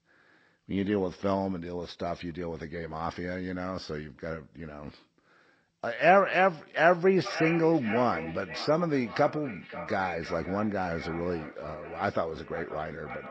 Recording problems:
echo of what is said; strong; from 7 s on; 530 ms later, 10 dB below the speech
garbled, watery; slightly; nothing above 7.5 kHz

